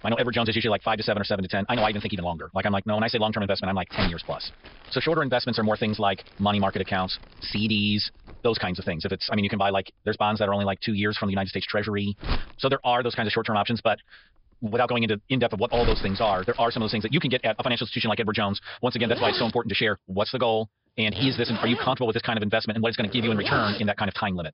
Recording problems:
wrong speed, natural pitch; too fast; 1.8 times normal speed
high frequencies cut off; noticeable; nothing above 5.5 kHz
household noises; loud; throughout; 9 dB below the speech

